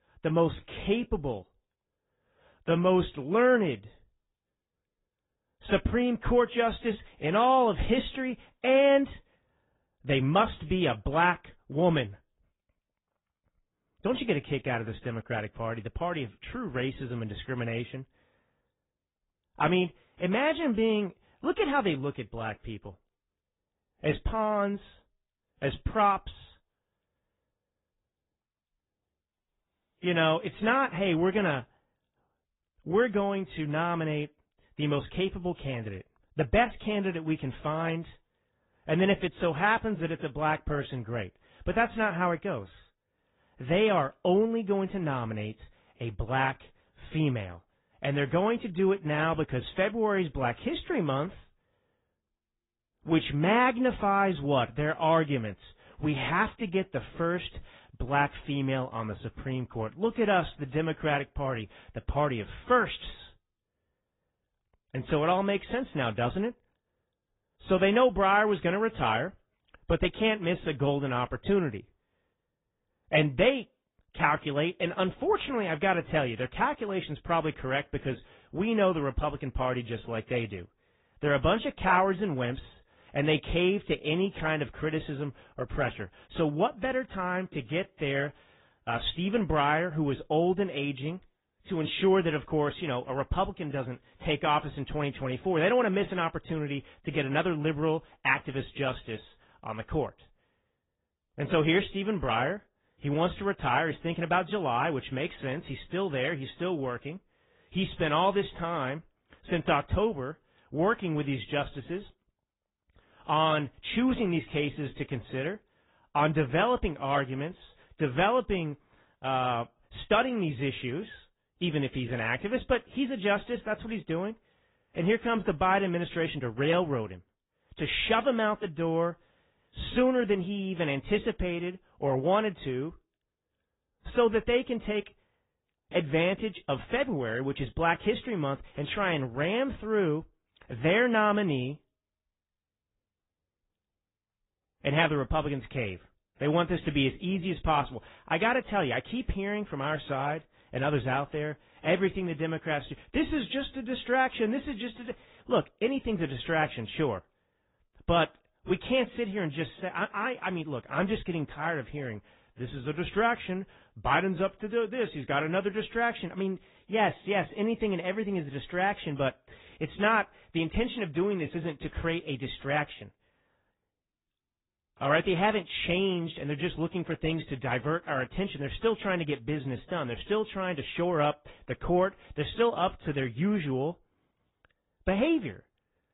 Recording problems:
high frequencies cut off; severe; nothing above 4 kHz
garbled, watery; slightly

